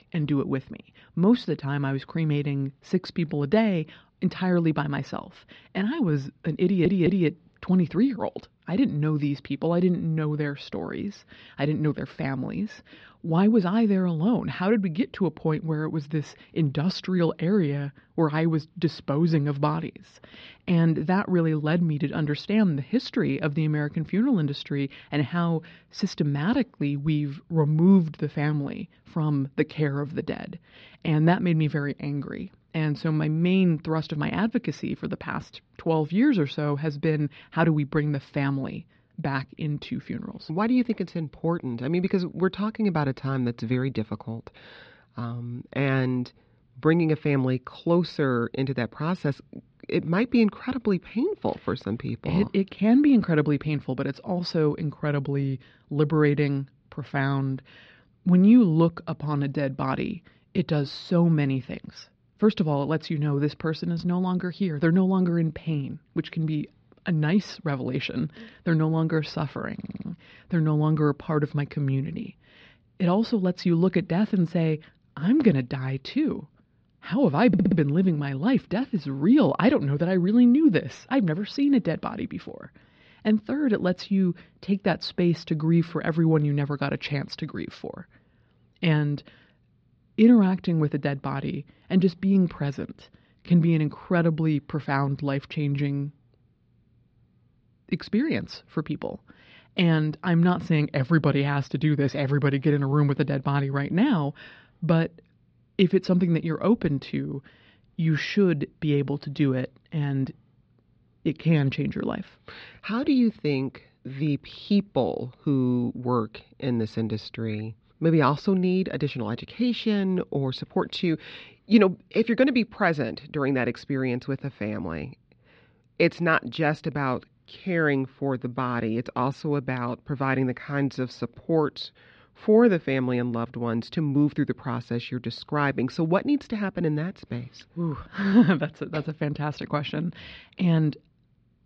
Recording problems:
muffled; slightly; fading above 4.5 kHz
audio stuttering; at 6.5 s, at 1:10 and at 1:17

